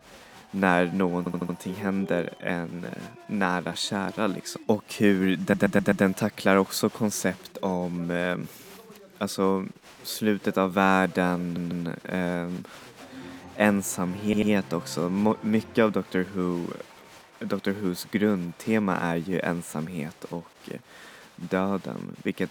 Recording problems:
crowd noise; faint; throughout; 20 dB below the speech
audio stuttering; 4 times, first at 1 s

